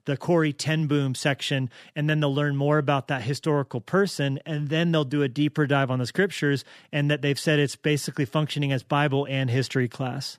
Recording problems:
none

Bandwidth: 14.5 kHz